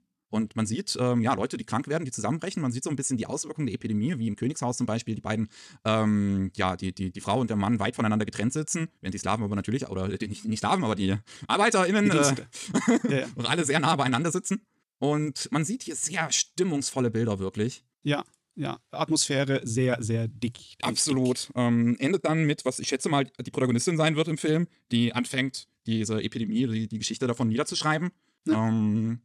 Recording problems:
wrong speed, natural pitch; too fast; 1.5 times normal speed

